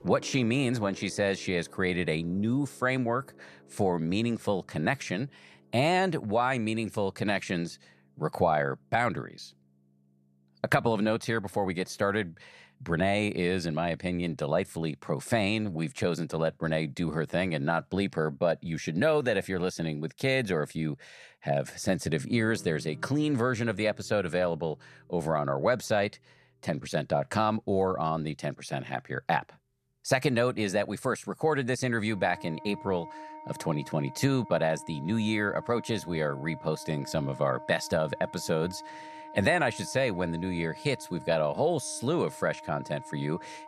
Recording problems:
background music; noticeable; throughout; 20 dB below the speech

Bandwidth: 14 kHz